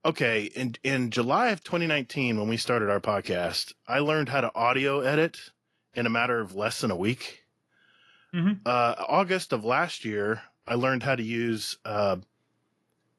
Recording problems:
garbled, watery; slightly; nothing above 11.5 kHz

